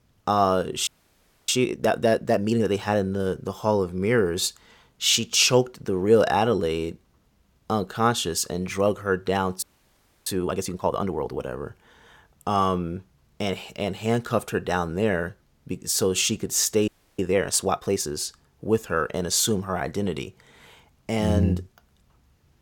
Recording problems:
audio freezing; at 1 s for 0.5 s, at 9.5 s for 0.5 s and at 17 s

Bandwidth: 17 kHz